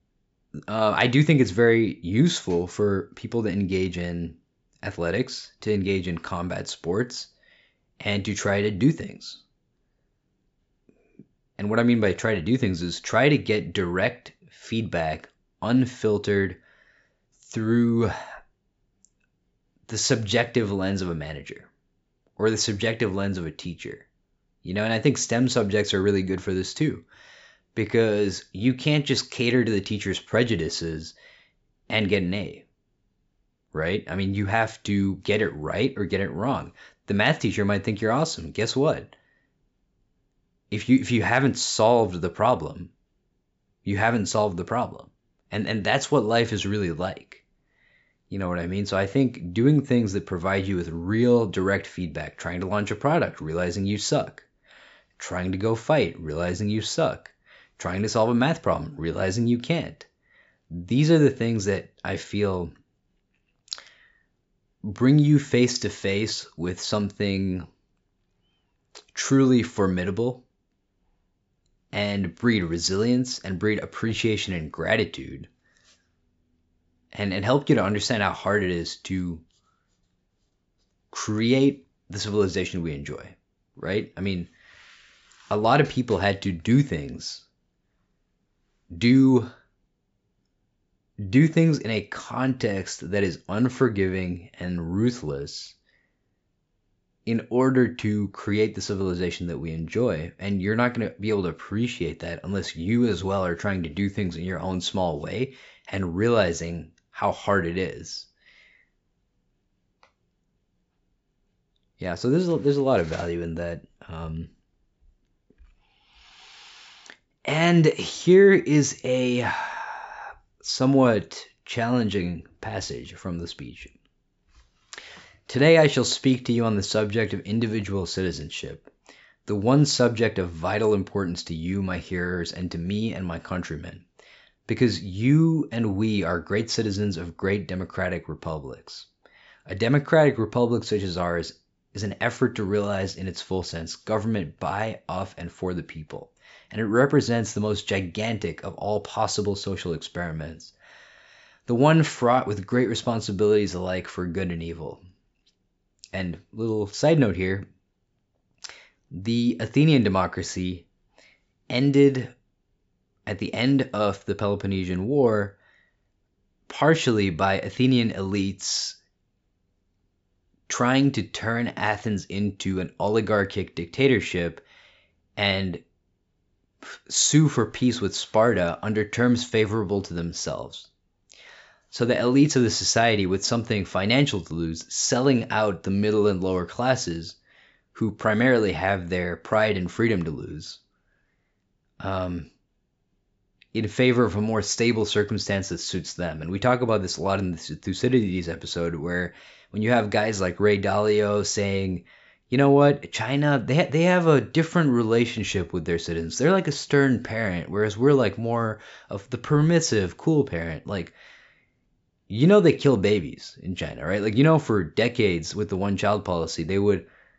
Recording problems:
high frequencies cut off; noticeable; nothing above 8 kHz

